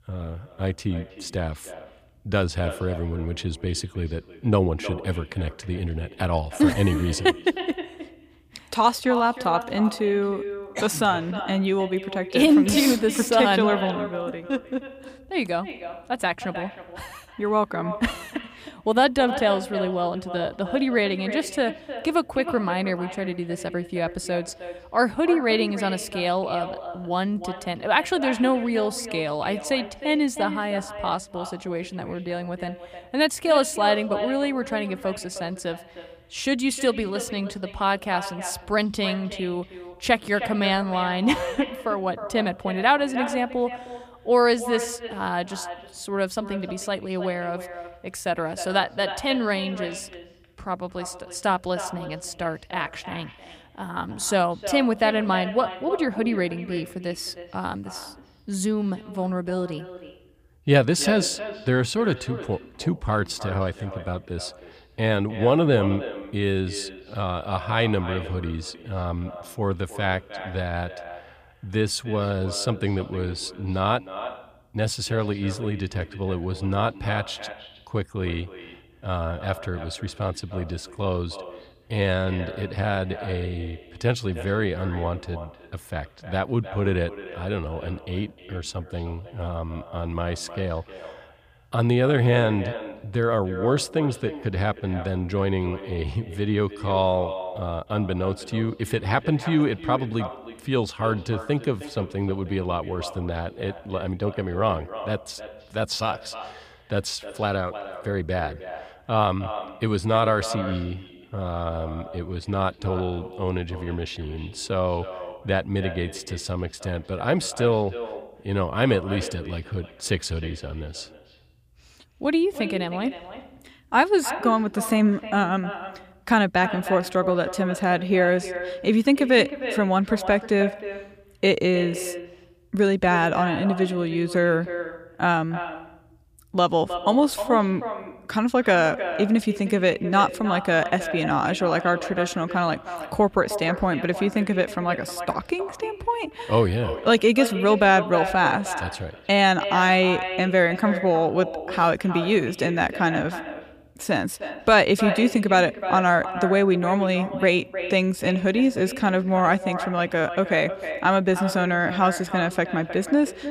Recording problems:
echo of what is said; strong; throughout; 310 ms later, 10 dB below the speech

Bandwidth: 15 kHz